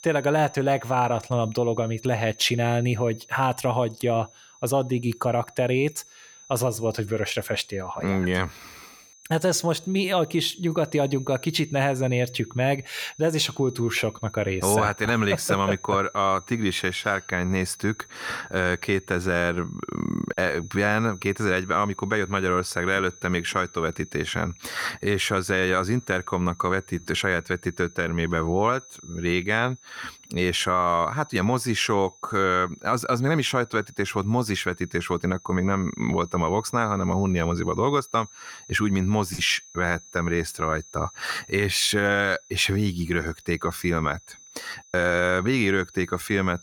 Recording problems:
high-pitched whine; faint; throughout; 6 kHz, 20 dB below the speech

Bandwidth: 18 kHz